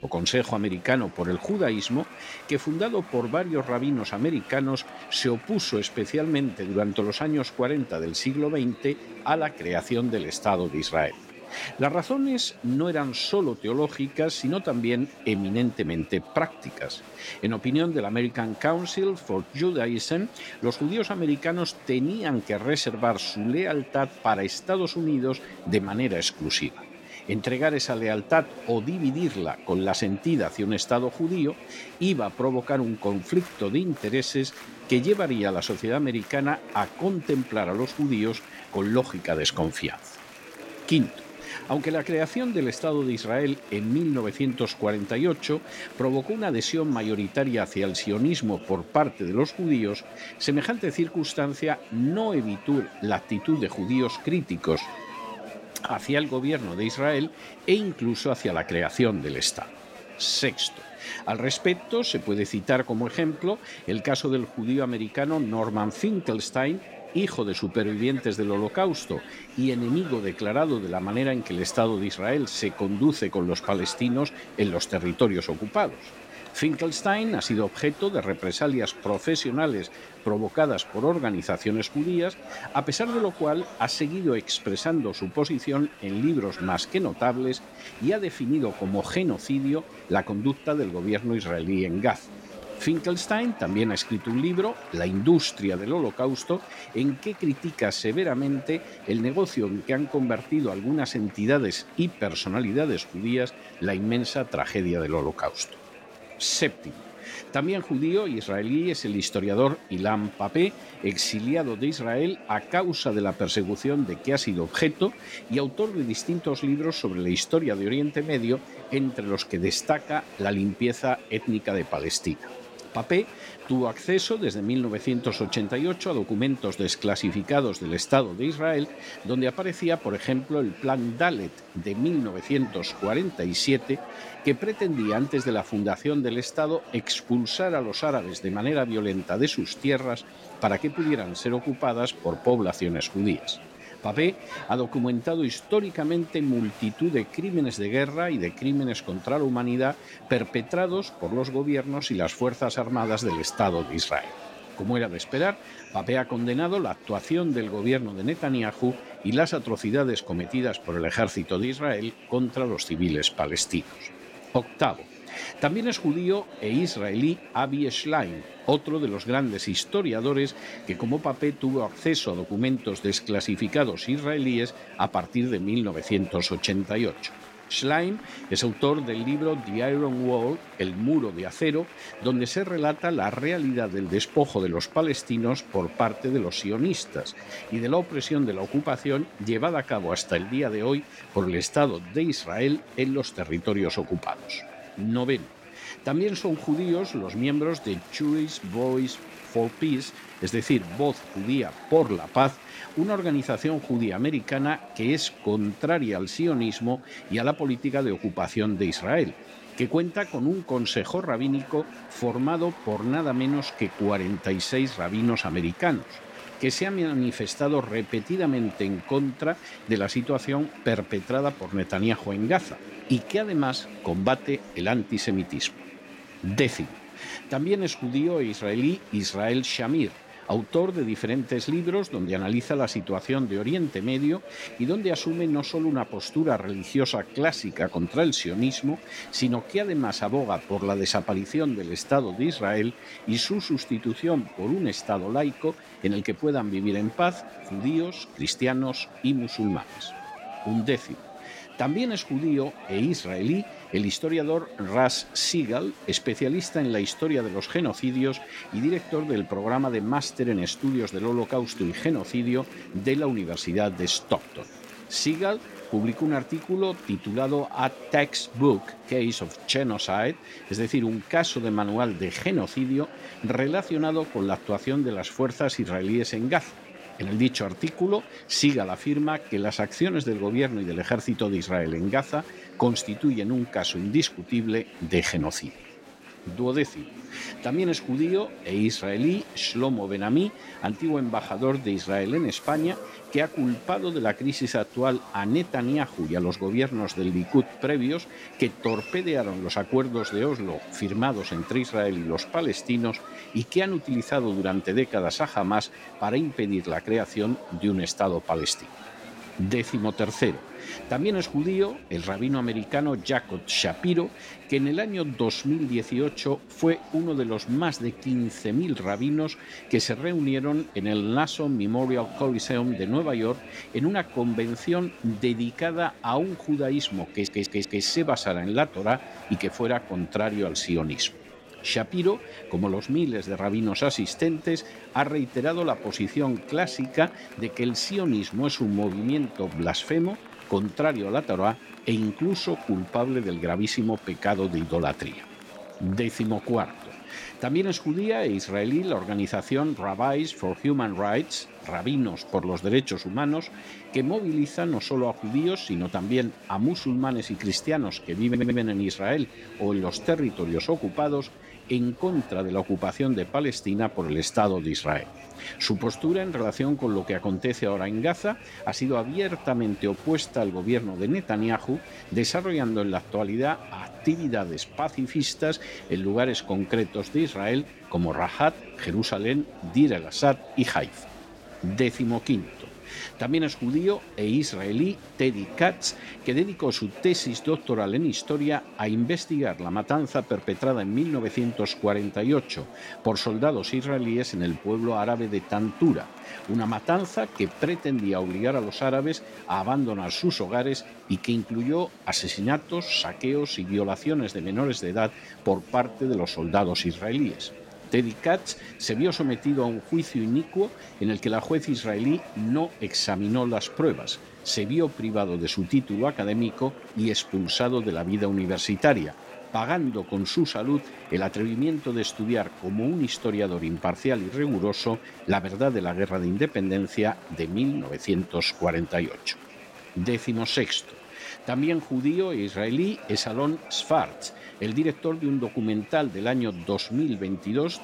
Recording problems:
murmuring crowd; noticeable; throughout; 15 dB below the speech
audio stuttering; at 5:27 and at 5:58

